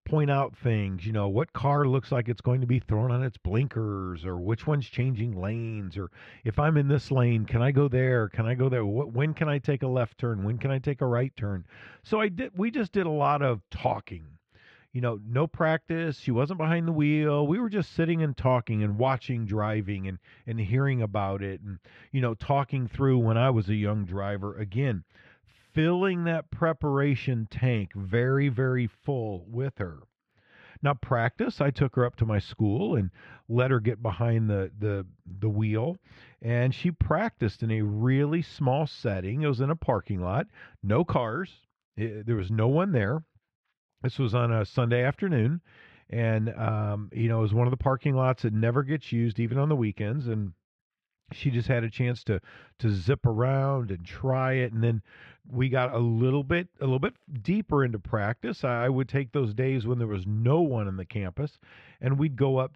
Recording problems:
muffled; slightly; fading above 2 kHz

